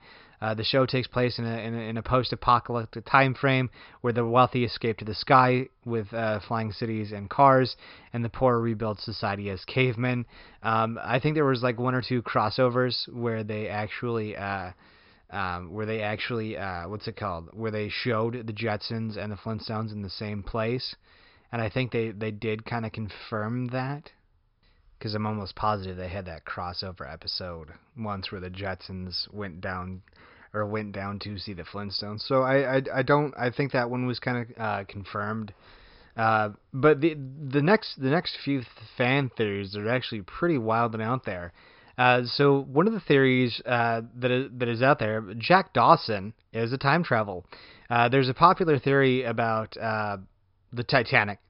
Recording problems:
high frequencies cut off; noticeable; nothing above 5.5 kHz

